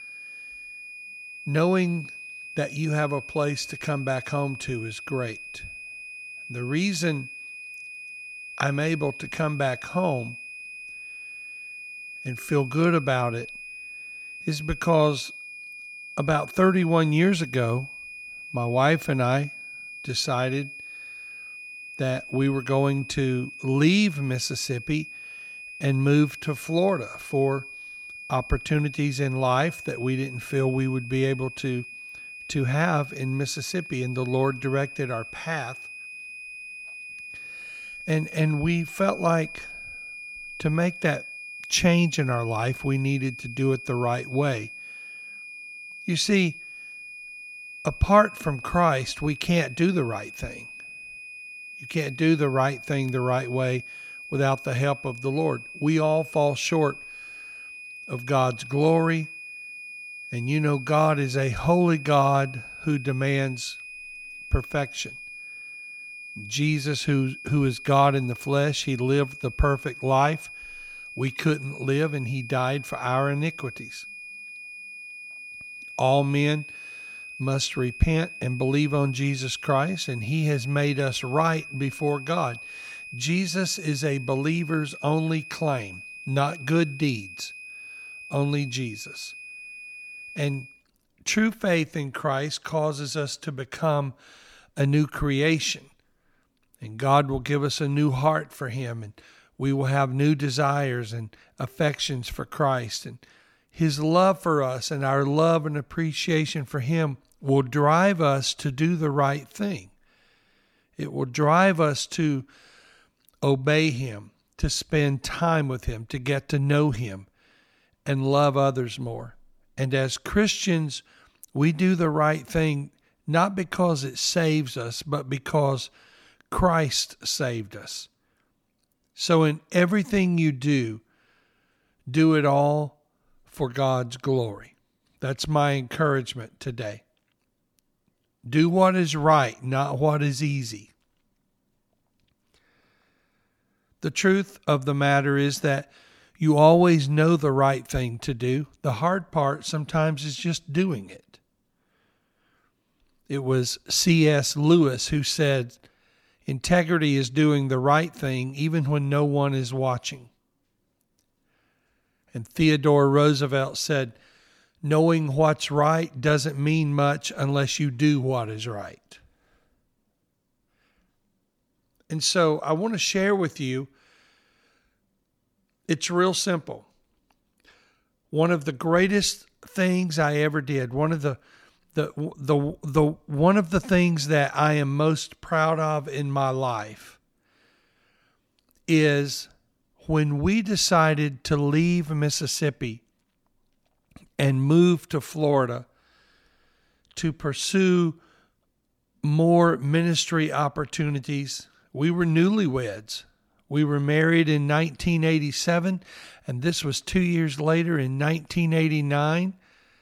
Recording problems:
high-pitched whine; noticeable; until 1:31; 2.5 kHz, 15 dB below the speech

